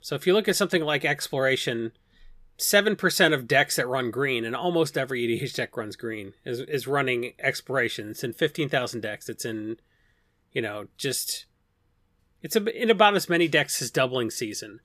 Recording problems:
none

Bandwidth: 14.5 kHz